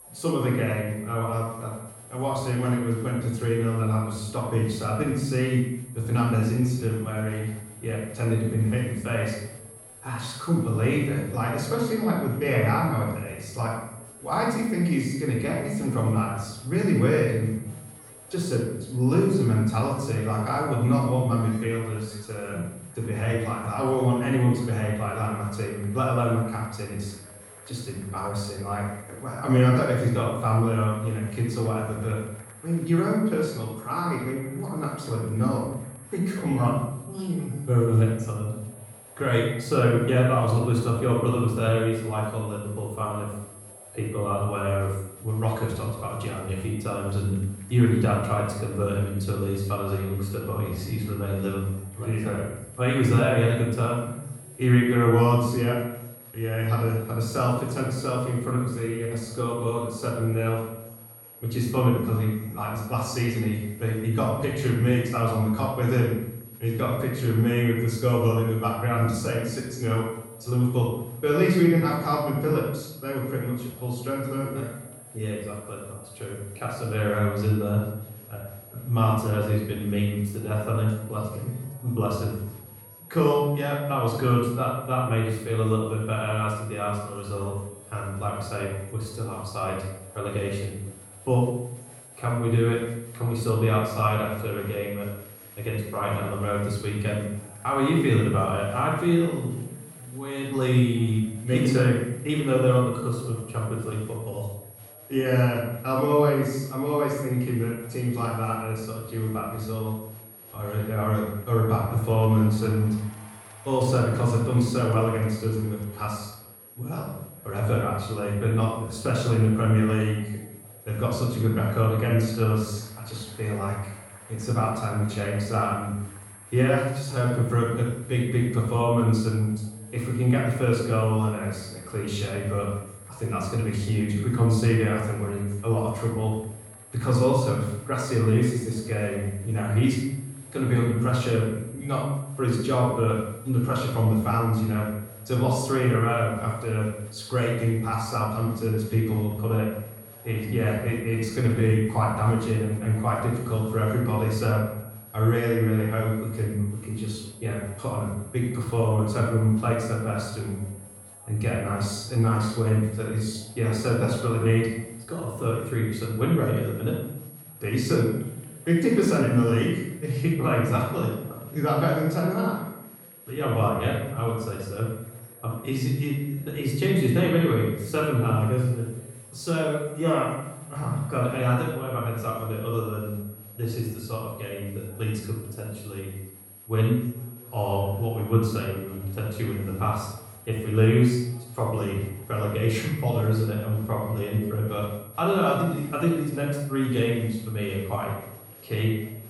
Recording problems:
off-mic speech; far
room echo; noticeable; dies away in 0.7 s
echo of what is said; faint; throughout; 130 ms later, 25 dB below the speech
high-pitched whine; noticeable; throughout; 11.5 kHz, 20 dB below the speech
murmuring crowd; faint; throughout; 30 dB below the speech
uneven, jittery; slightly; from 43 s to 2:45

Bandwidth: 17 kHz